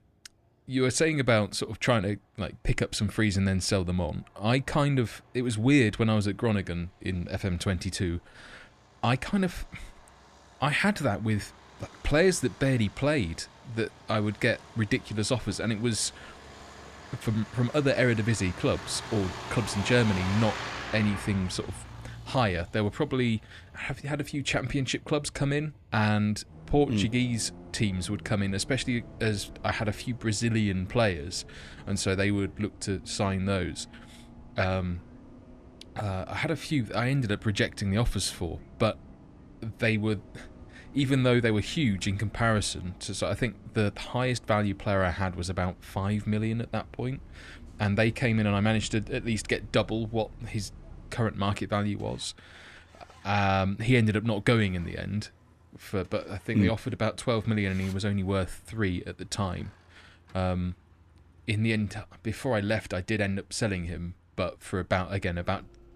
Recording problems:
traffic noise; noticeable; throughout; 15 dB below the speech

